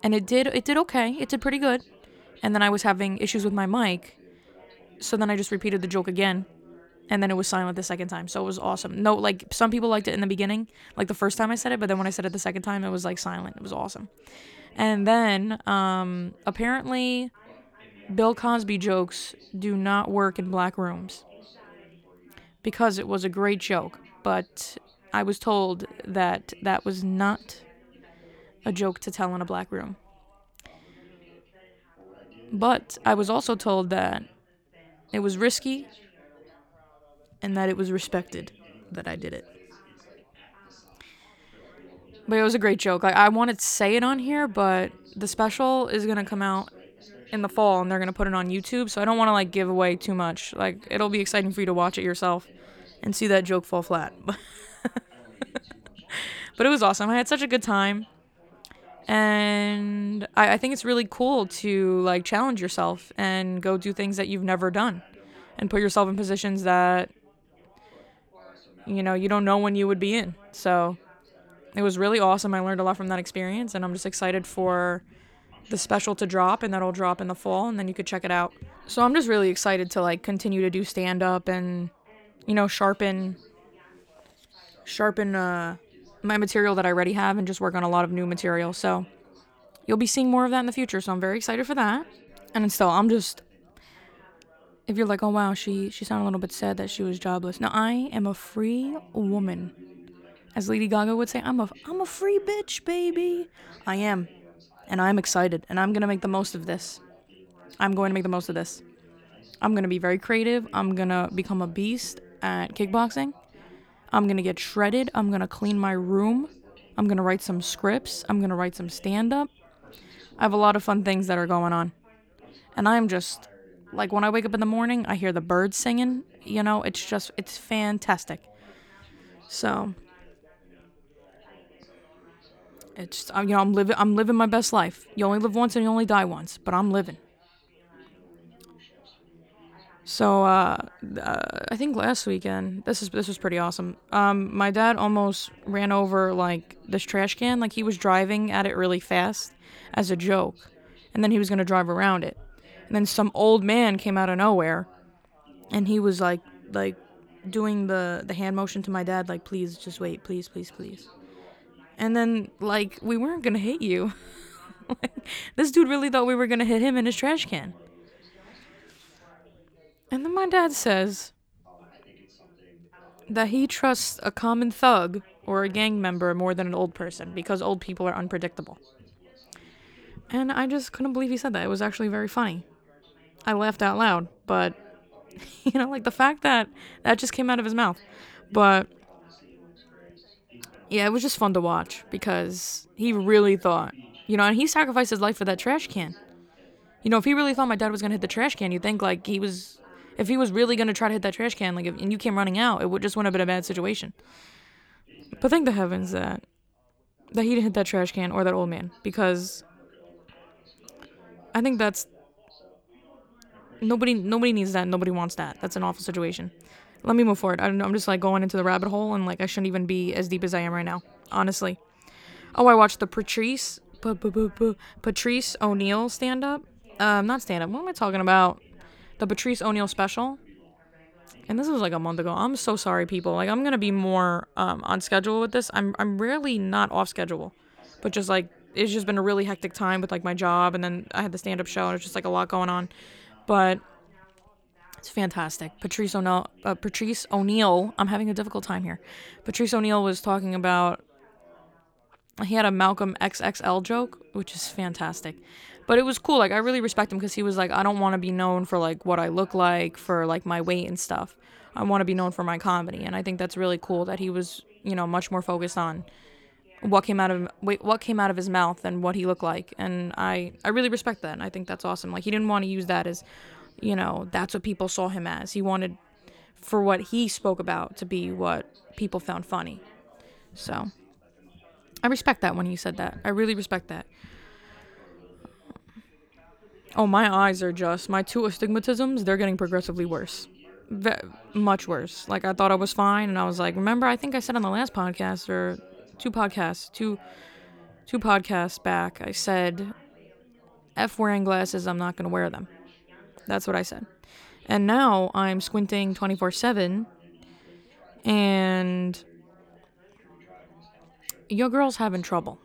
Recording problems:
background chatter; faint; throughout; 4 voices, 30 dB below the speech

